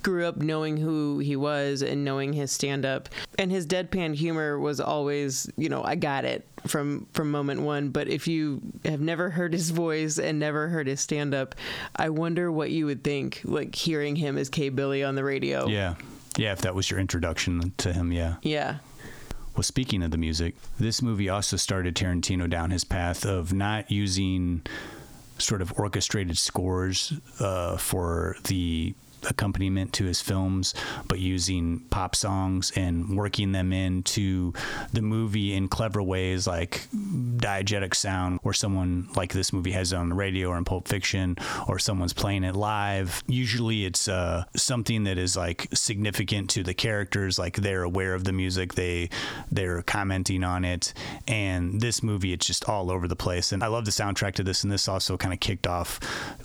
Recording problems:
squashed, flat; heavily

